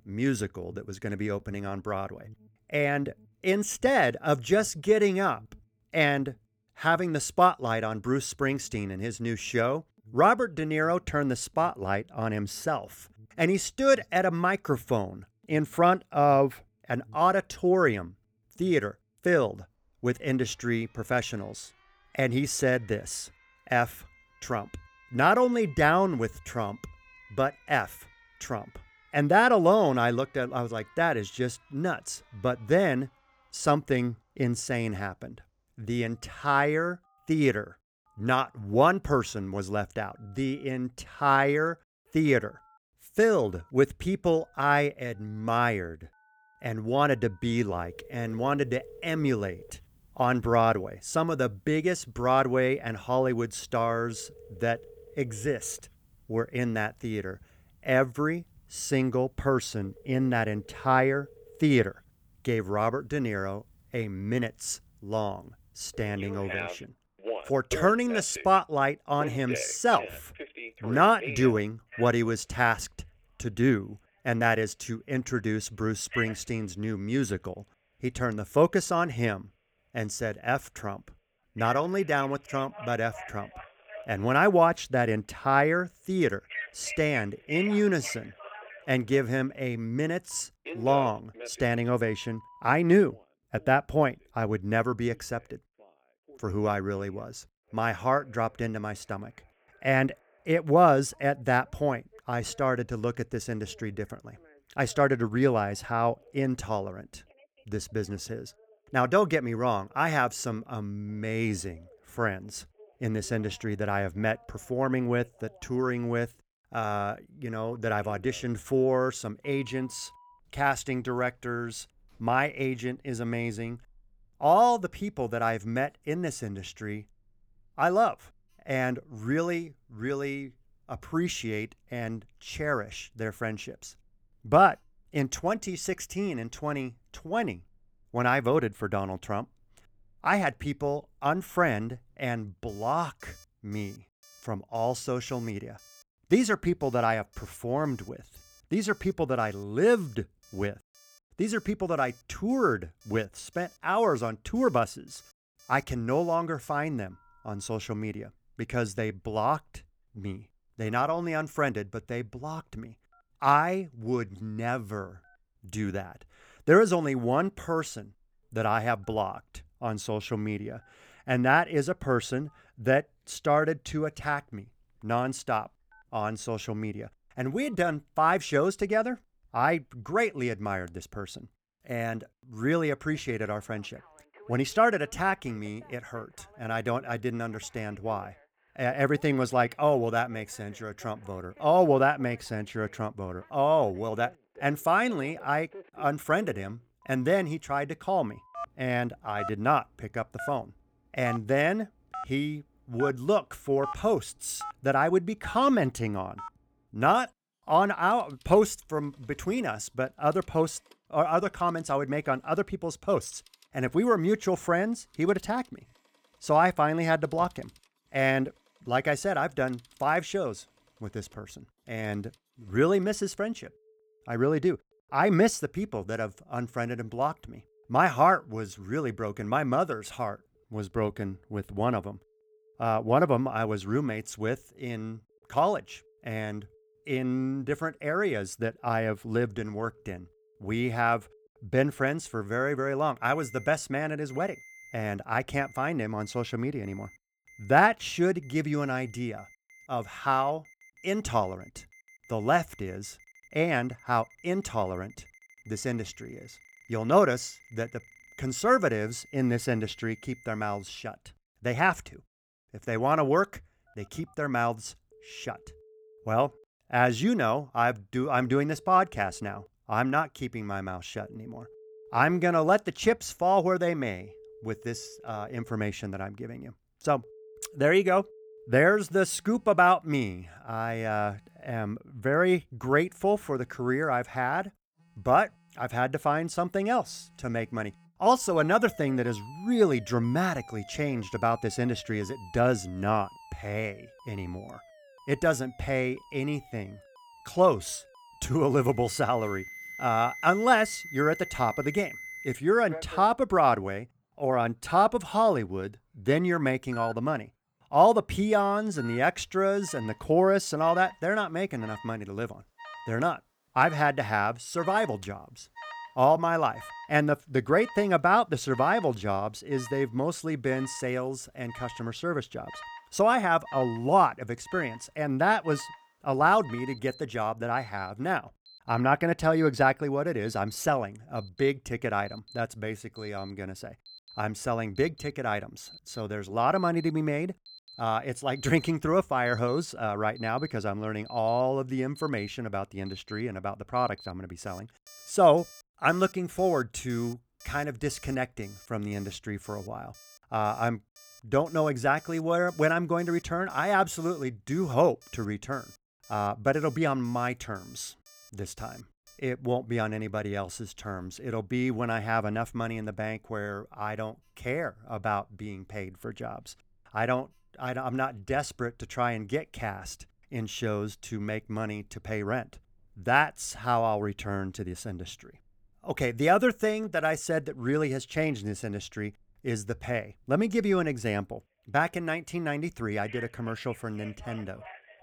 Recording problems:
alarms or sirens; noticeable; throughout; 20 dB below the speech

